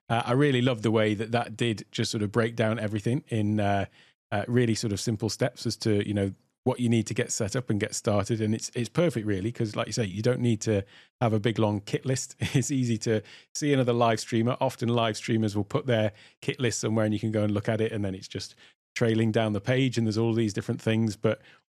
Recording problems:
none

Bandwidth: 13.5 kHz